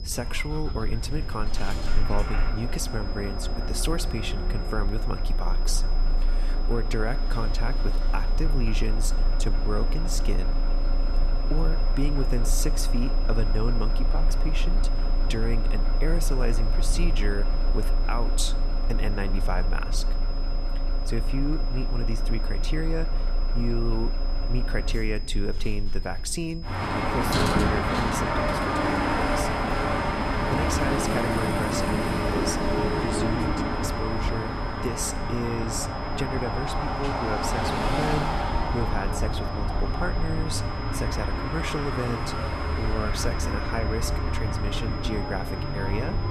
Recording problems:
traffic noise; very loud; throughout; 4 dB above the speech
high-pitched whine; noticeable; throughout; 5 kHz, 10 dB below the speech
low rumble; noticeable; throughout; 20 dB below the speech

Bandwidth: 14 kHz